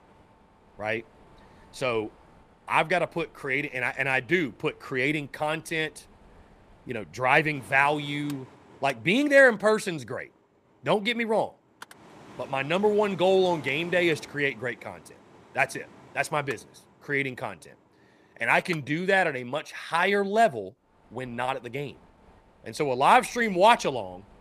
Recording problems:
machinery noise; faint; throughout; 25 dB below the speech

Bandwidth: 14.5 kHz